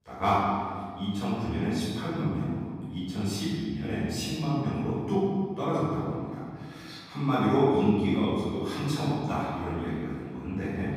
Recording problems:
room echo; strong; dies away in 1.9 s
off-mic speech; far

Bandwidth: 15.5 kHz